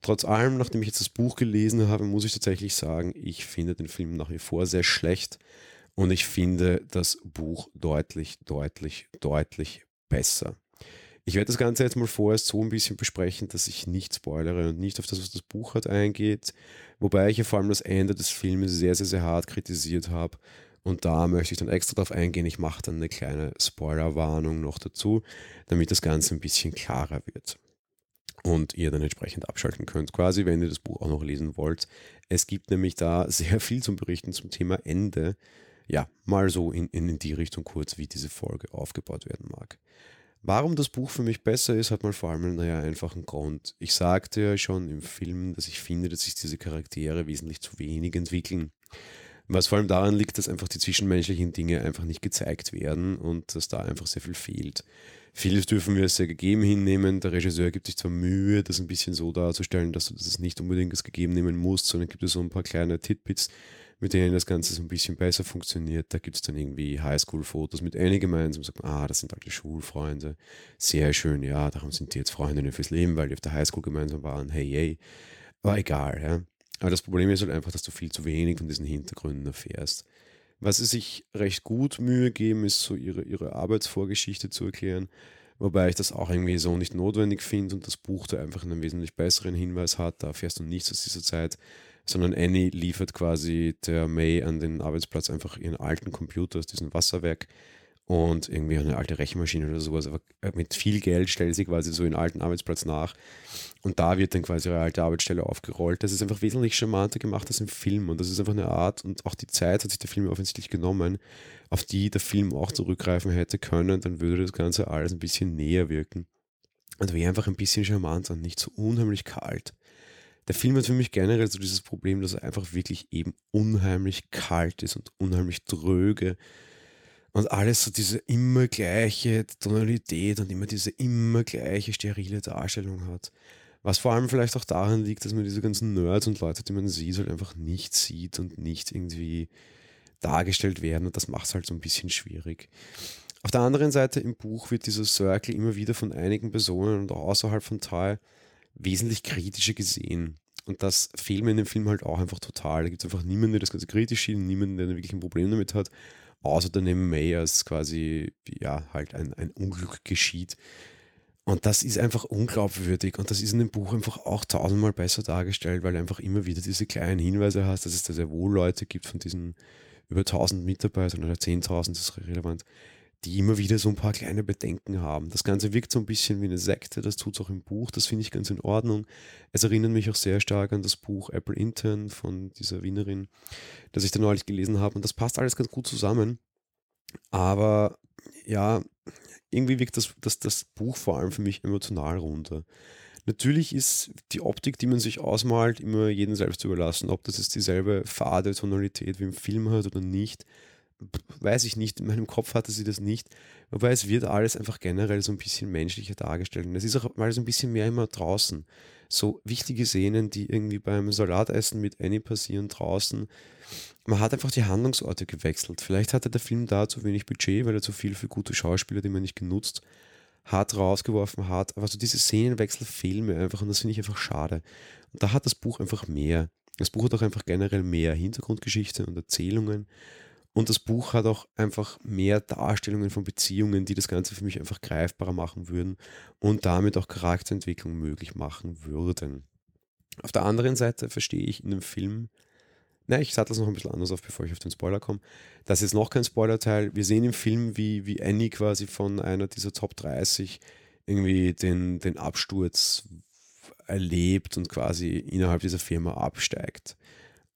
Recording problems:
none

